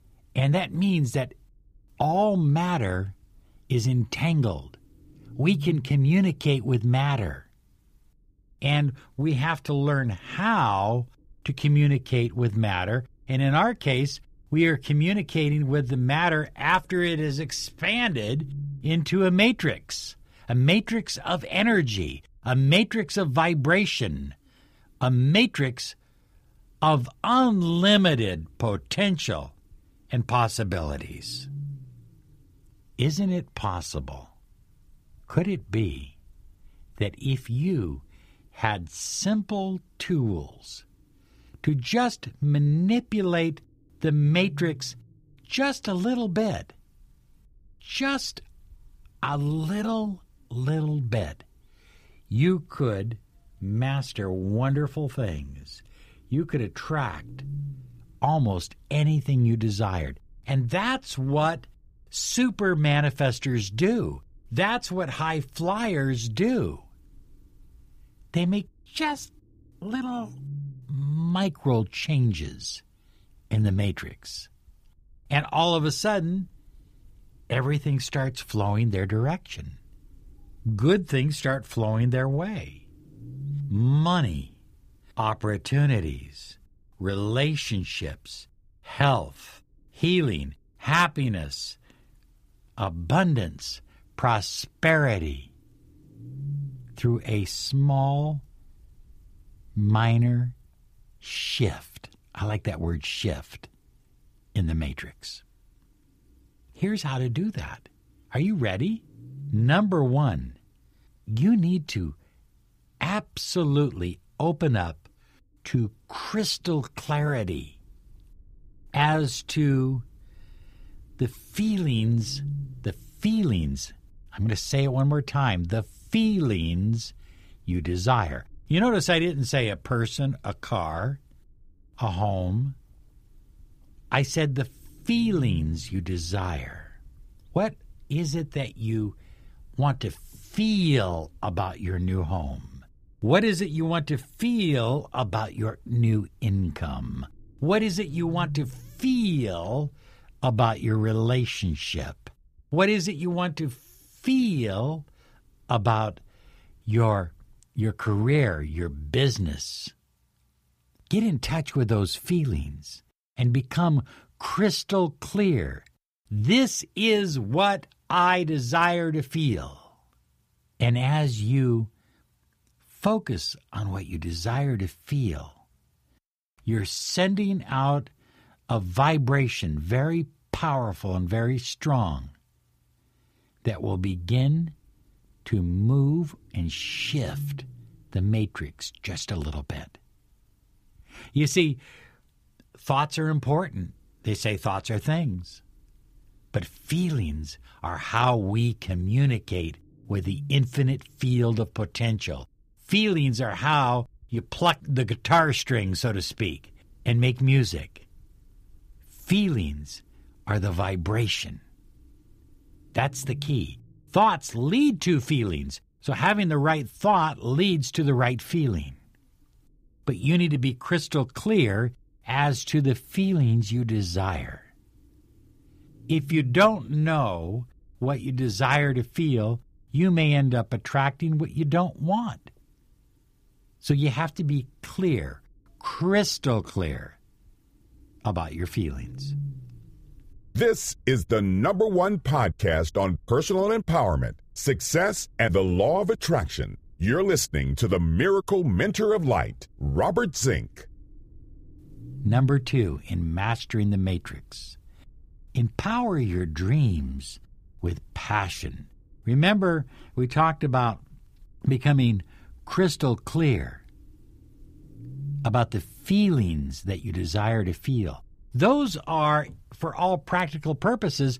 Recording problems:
low rumble; faint; until 2:38 and from 3:04 on; 25 dB below the speech

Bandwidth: 15 kHz